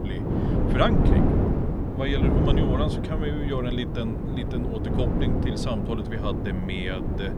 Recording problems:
wind noise on the microphone; heavy; 1 dB below the speech

